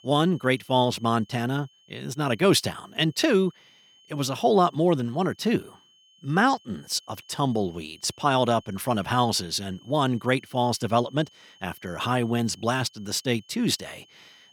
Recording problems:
high-pitched whine; faint; throughout; 3 kHz, 30 dB below the speech

